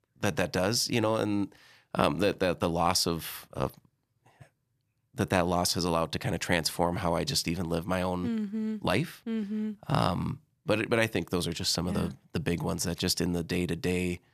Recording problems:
none

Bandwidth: 14.5 kHz